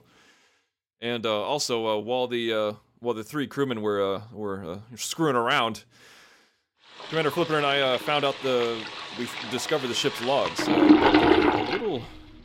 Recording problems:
household noises; very loud; from 7 s on; 2 dB above the speech

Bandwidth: 16.5 kHz